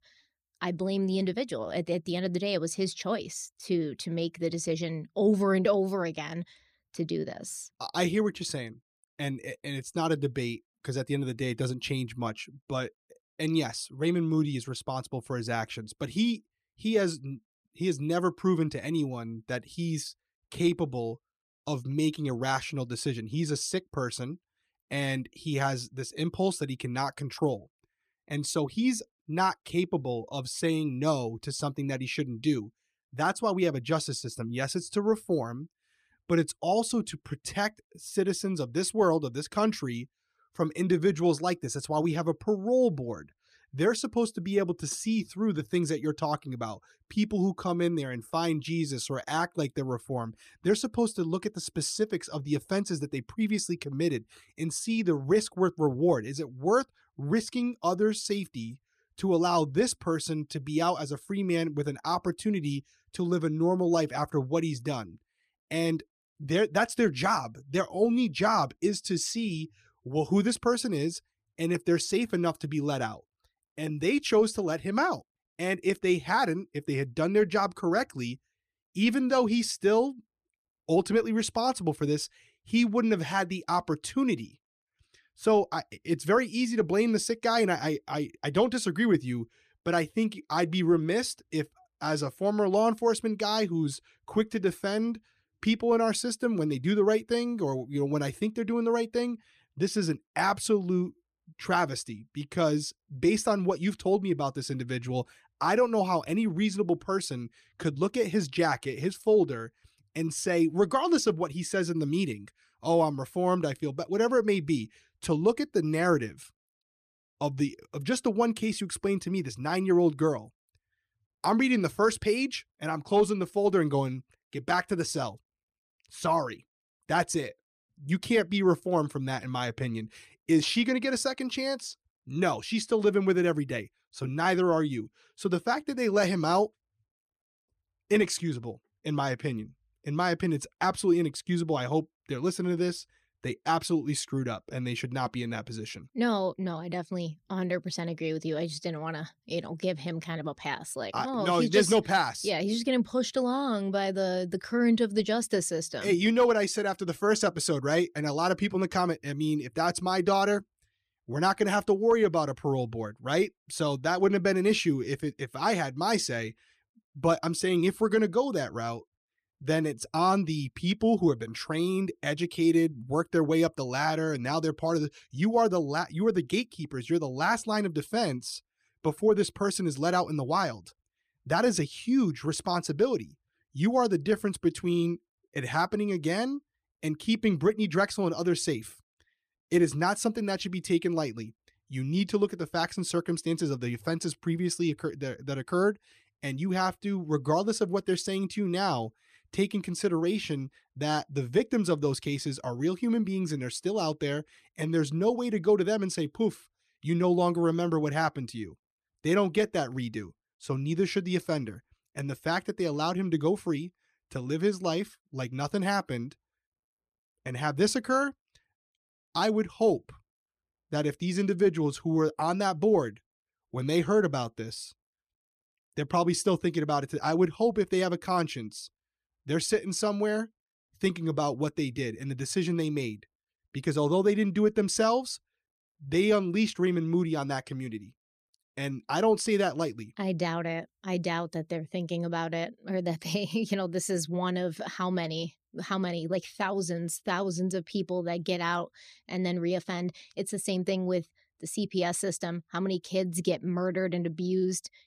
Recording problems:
none

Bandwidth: 14.5 kHz